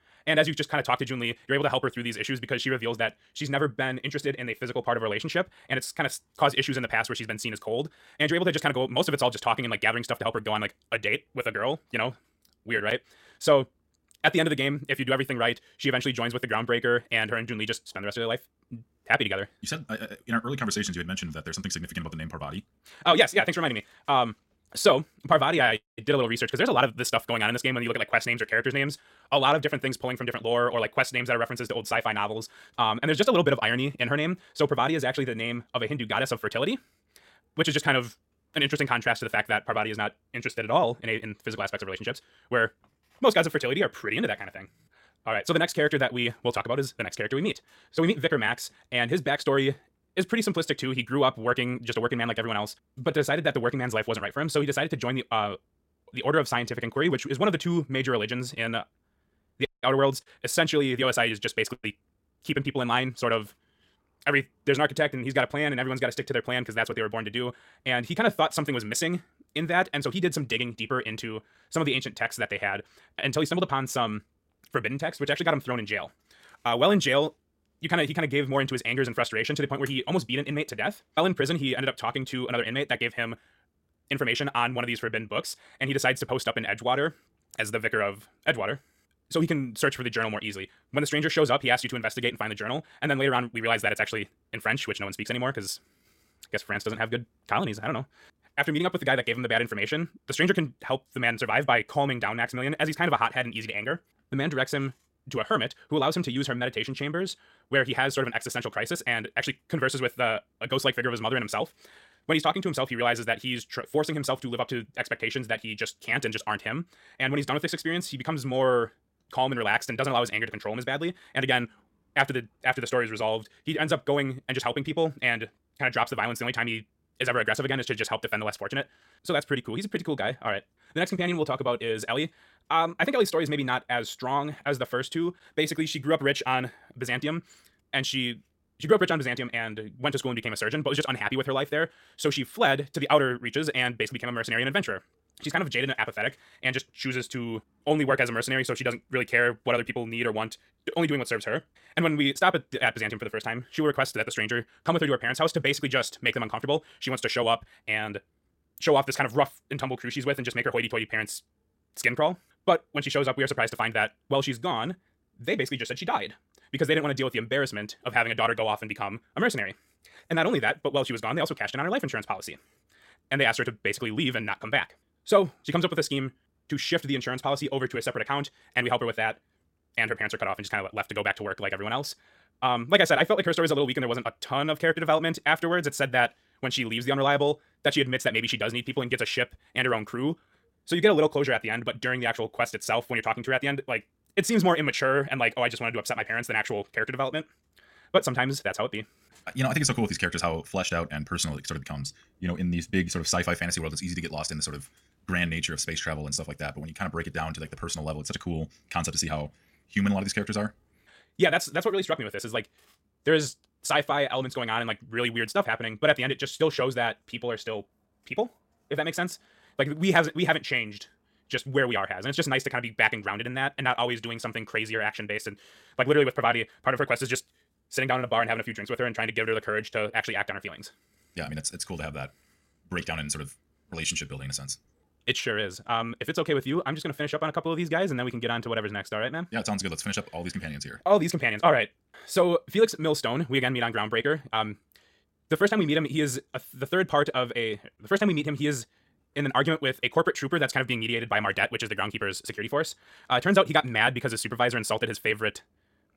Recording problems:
wrong speed, natural pitch; too fast; 1.8 times normal speed

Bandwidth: 16.5 kHz